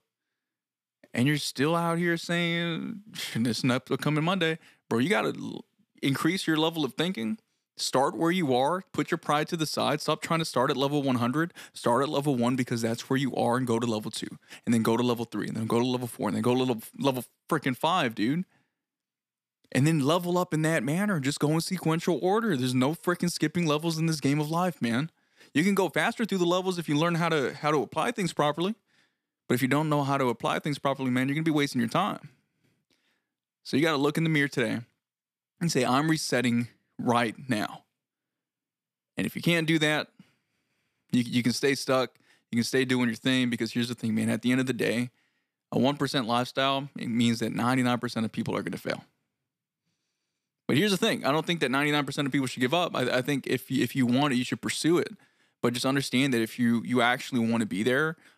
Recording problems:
none

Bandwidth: 14.5 kHz